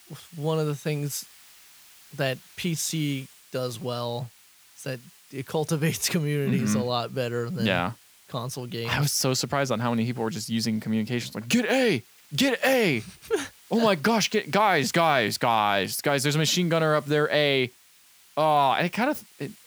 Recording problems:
hiss; faint; throughout; 25 dB below the speech

